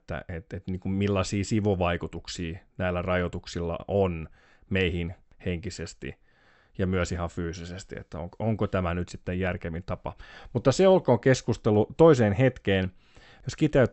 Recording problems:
high frequencies cut off; noticeable; nothing above 8 kHz

